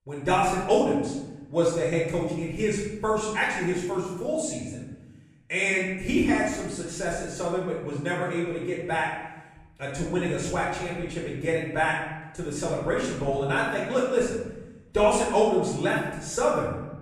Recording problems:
off-mic speech; far
room echo; noticeable; dies away in 1 s

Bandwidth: 15 kHz